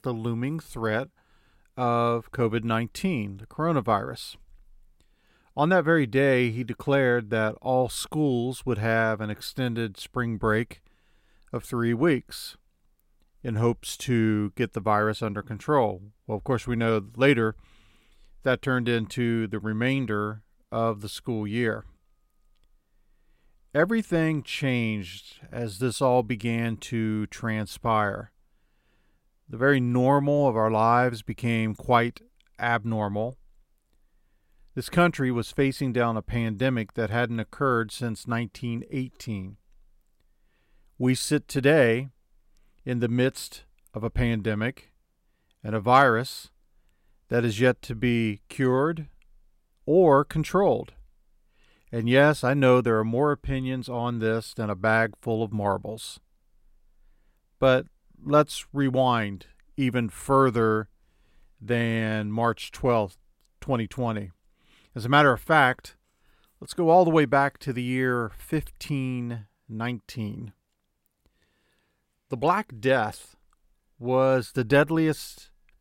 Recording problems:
none

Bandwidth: 16 kHz